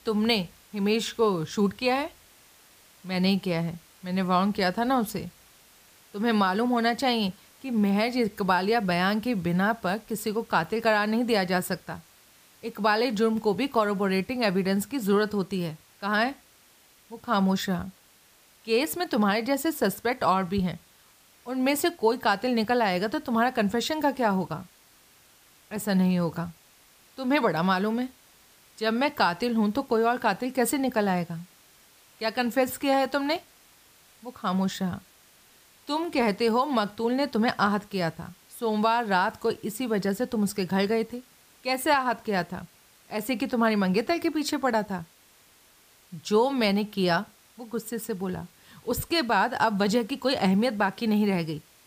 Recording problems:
hiss; faint; throughout; 30 dB below the speech

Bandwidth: 15 kHz